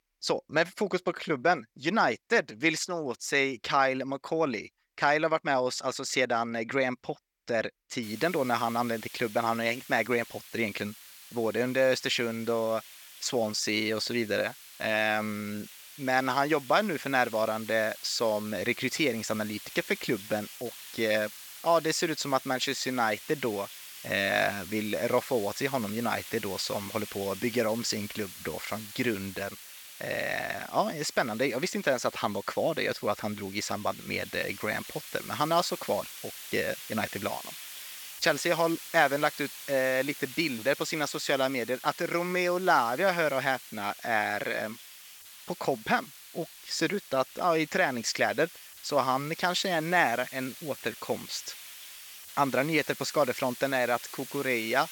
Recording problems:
thin; somewhat; fading below 1 kHz
hiss; noticeable; from 8 s on; 15 dB below the speech

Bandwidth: 18 kHz